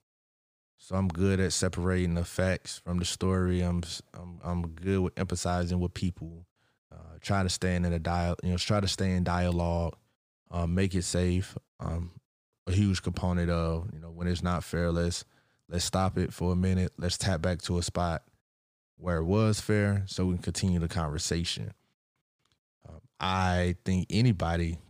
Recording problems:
none

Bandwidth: 15 kHz